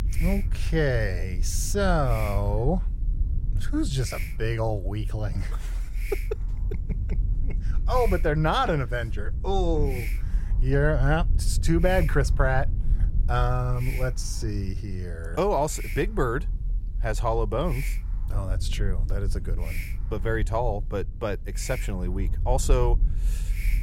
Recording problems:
hiss; noticeable; throughout; 15 dB below the speech
low rumble; faint; throughout; 20 dB below the speech

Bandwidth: 16 kHz